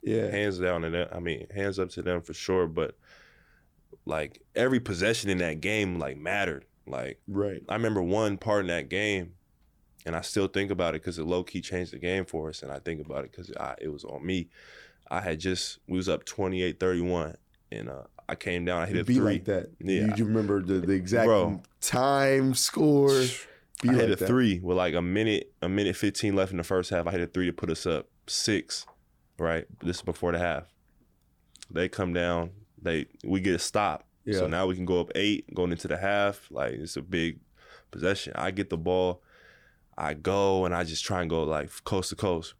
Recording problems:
none

